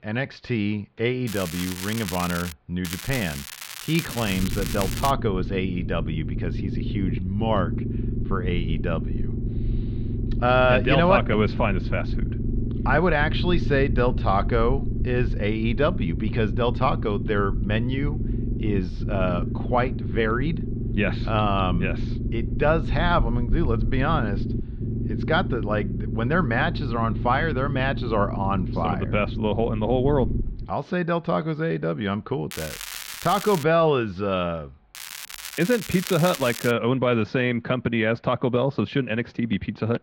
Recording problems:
muffled; slightly; fading above 4 kHz
crackling; loud; 4 times, first at 1.5 s; 9 dB below the speech
low rumble; noticeable; from 4.5 to 31 s; 15 dB below the speech

